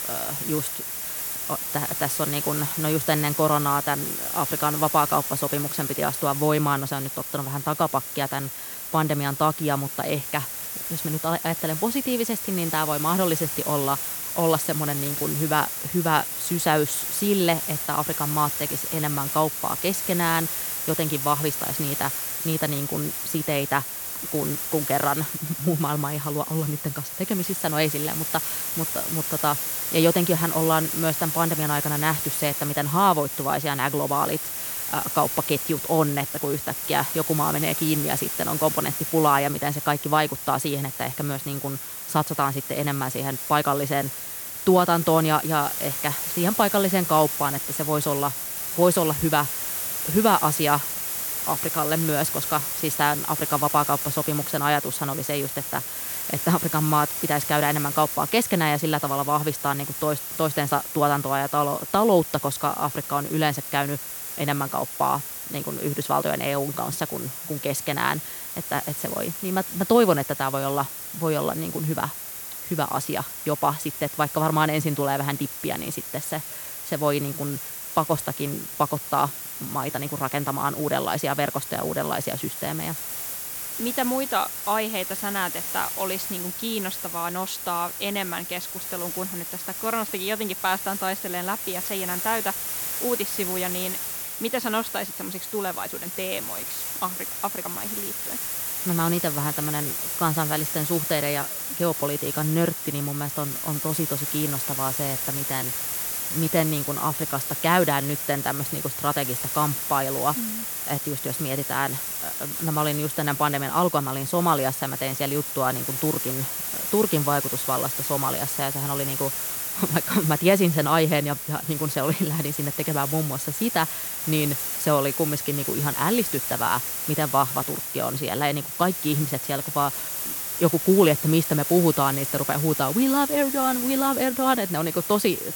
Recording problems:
hiss; loud; throughout; 2 dB below the speech

